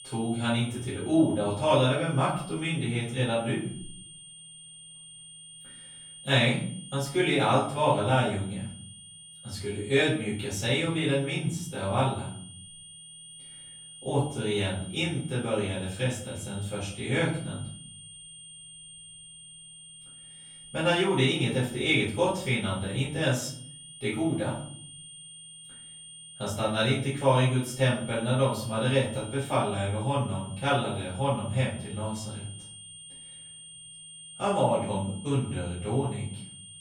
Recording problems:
off-mic speech; far
room echo; noticeable; dies away in 0.6 s
high-pitched whine; noticeable; throughout; 9 kHz, 15 dB below the speech

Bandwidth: 17 kHz